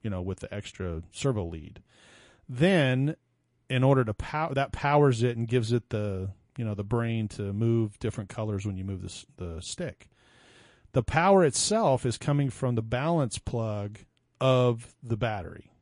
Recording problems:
garbled, watery; slightly; nothing above 10.5 kHz

